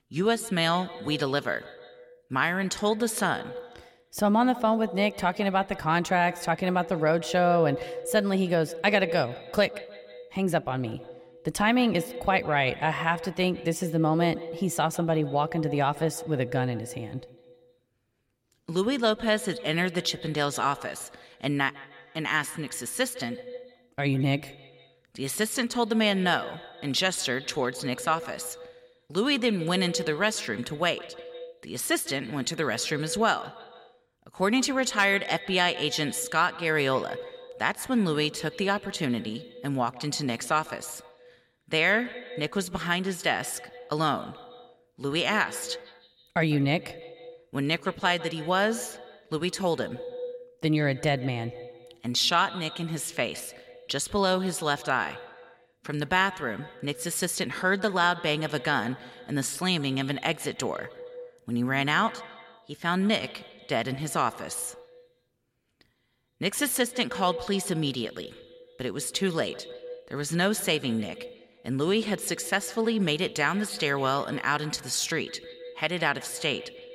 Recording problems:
echo of what is said; noticeable; throughout; 150 ms later, 15 dB below the speech

